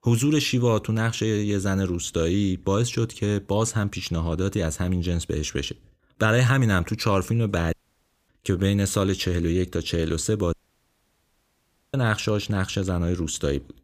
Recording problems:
audio cutting out; at 7.5 s for 0.5 s and at 11 s for 1.5 s

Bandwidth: 15 kHz